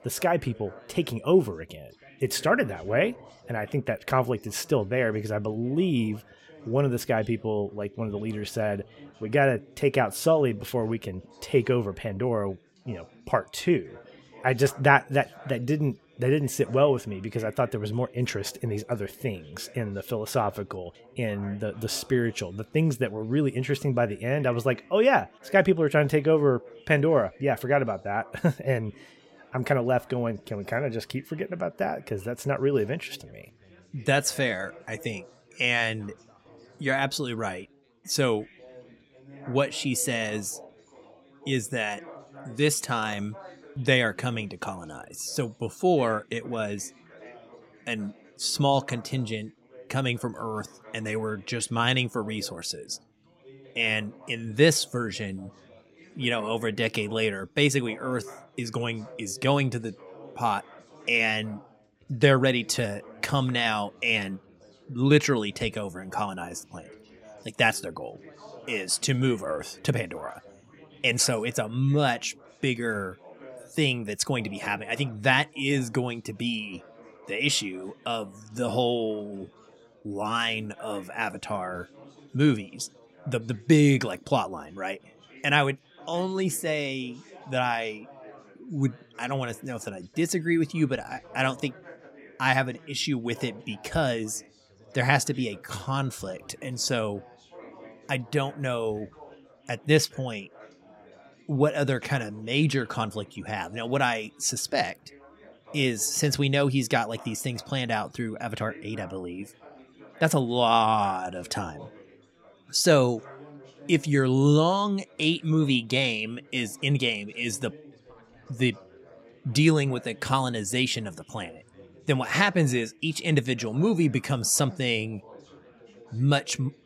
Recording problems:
chatter from many people; faint; throughout; 25 dB below the speech

